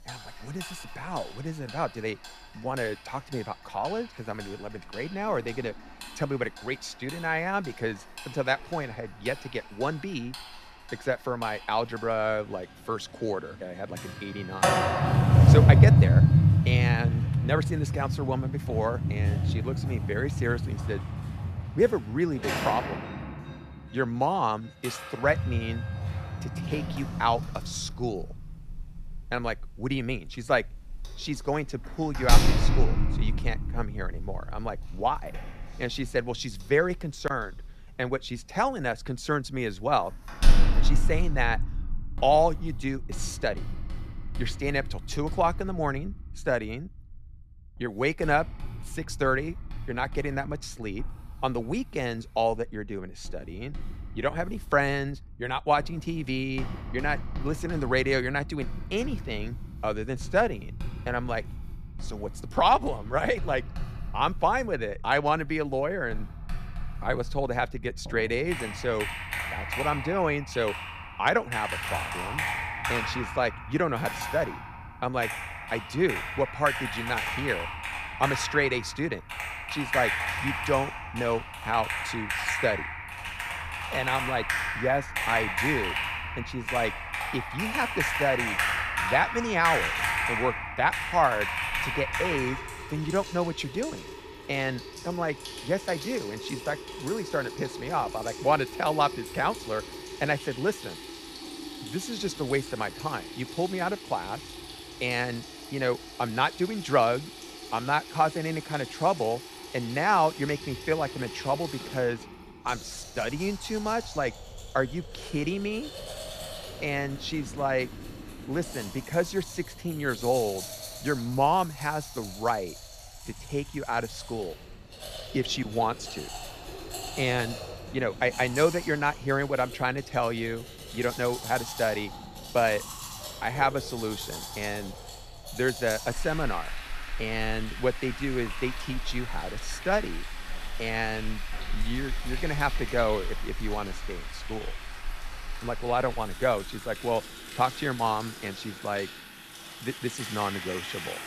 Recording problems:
household noises; loud; throughout; 2 dB below the speech

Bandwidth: 14.5 kHz